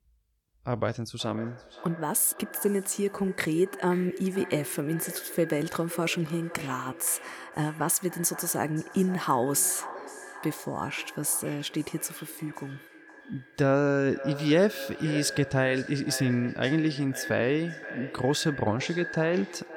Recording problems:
echo of what is said; noticeable; throughout; 520 ms later, 15 dB below the speech

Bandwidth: 18.5 kHz